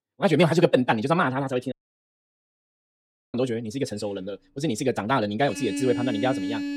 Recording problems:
wrong speed, natural pitch; too fast; 1.6 times normal speed
traffic noise; loud; from 4.5 s on; 5 dB below the speech
audio cutting out; at 1.5 s for 1.5 s

